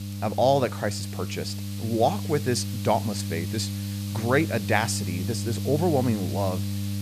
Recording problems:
electrical hum; noticeable; throughout; 50 Hz, 15 dB below the speech
hiss; noticeable; throughout; 15 dB below the speech

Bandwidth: 14.5 kHz